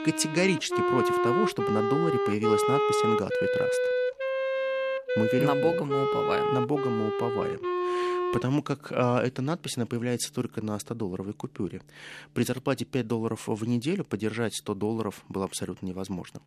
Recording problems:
background music; very loud; throughout; 2 dB above the speech

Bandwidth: 14 kHz